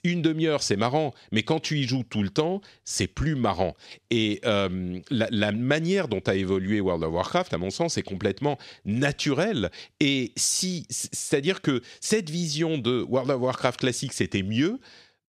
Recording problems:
none

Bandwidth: 13.5 kHz